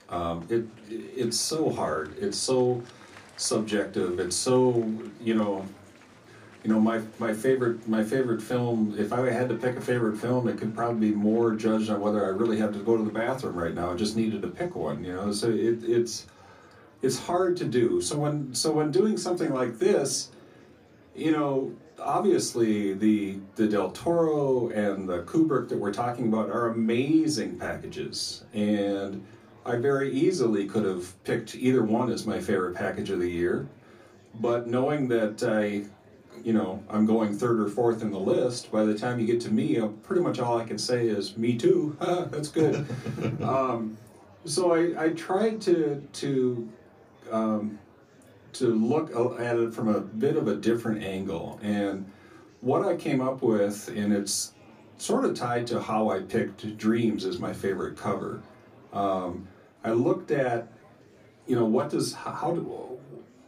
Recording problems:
off-mic speech; far
room echo; very slight; dies away in 0.2 s
murmuring crowd; faint; throughout; 25 dB below the speech

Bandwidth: 15 kHz